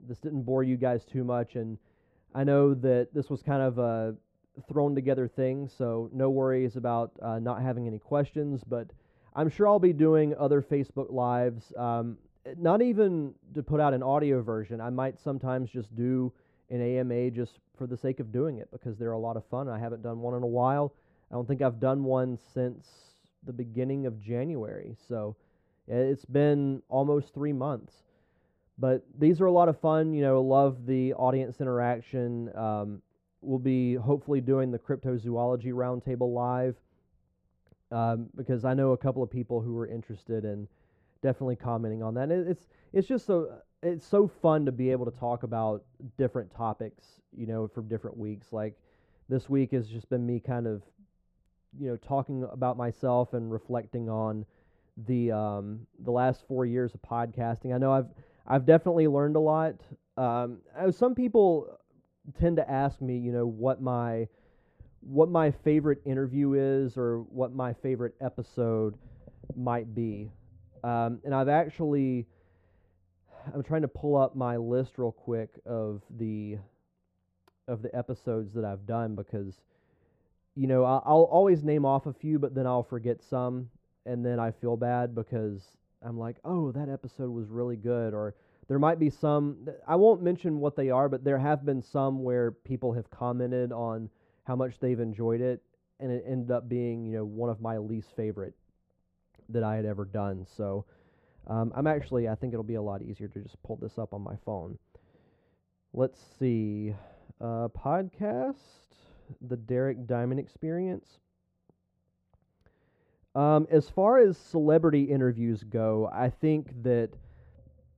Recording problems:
muffled; very; fading above 2 kHz

